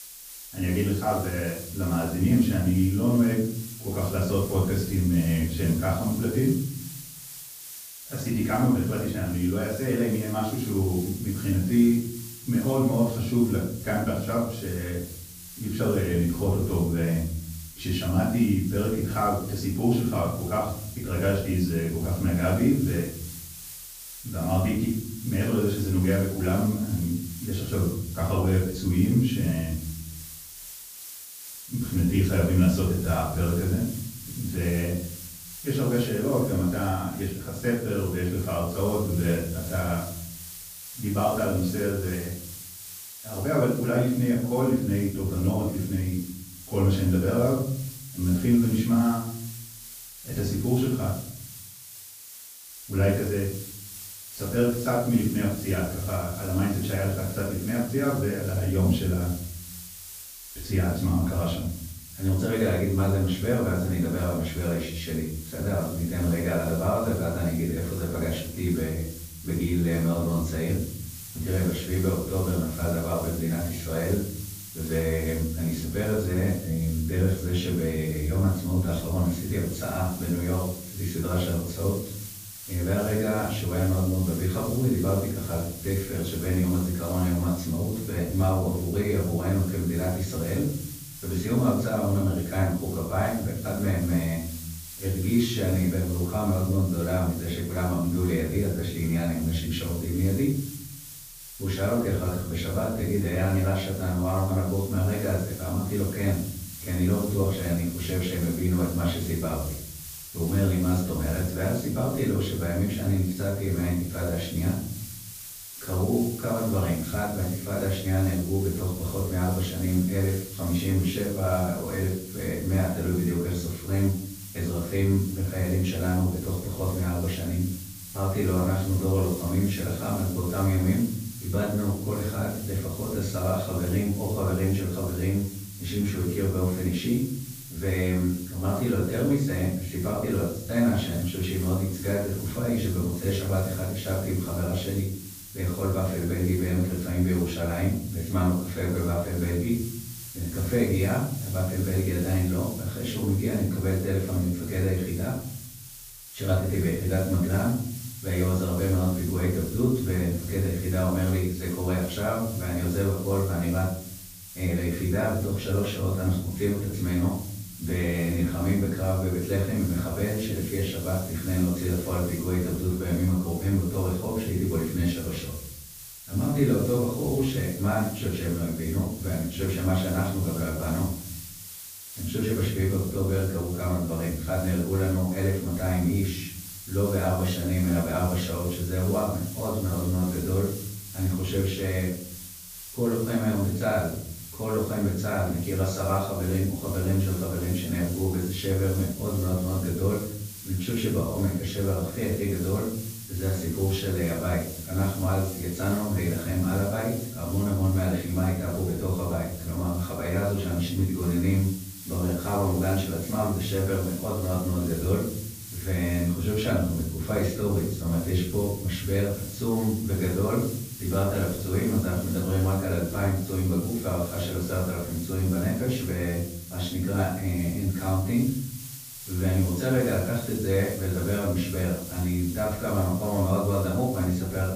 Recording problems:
off-mic speech; far
room echo; noticeable; dies away in 0.9 s
hiss; noticeable; throughout; 15 dB below the speech

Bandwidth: 15 kHz